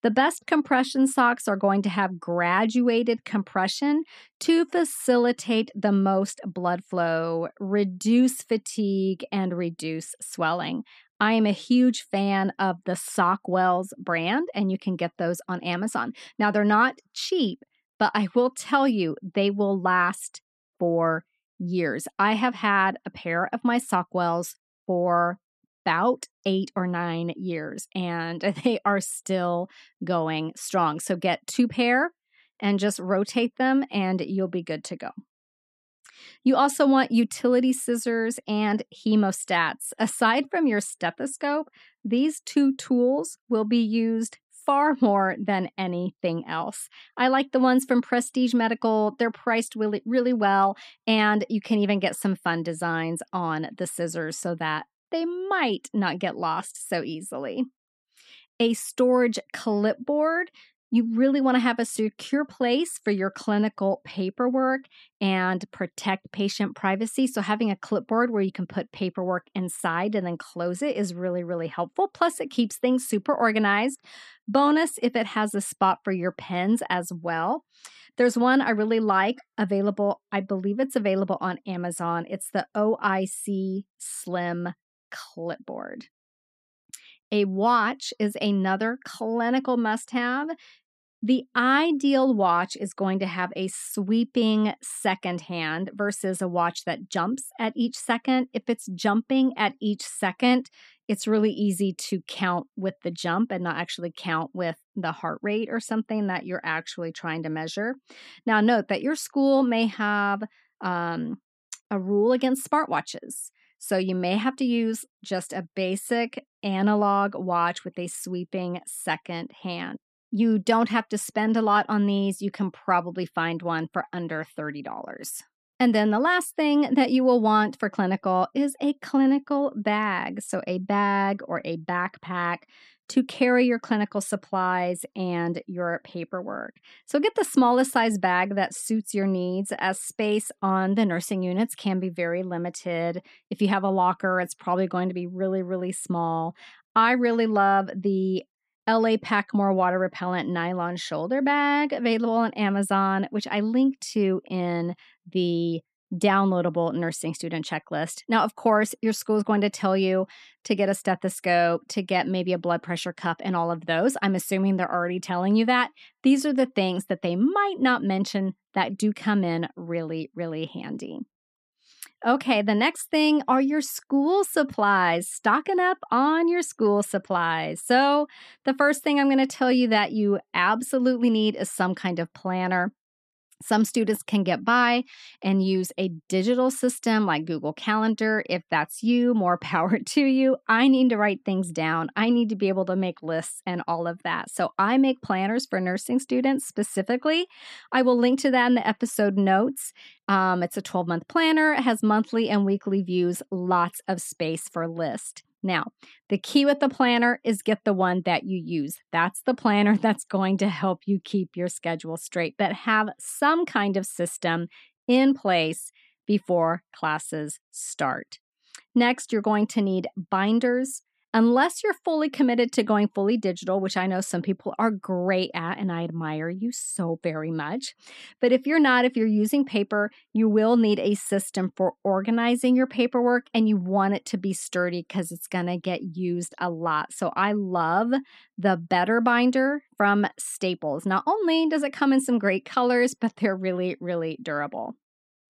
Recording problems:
none

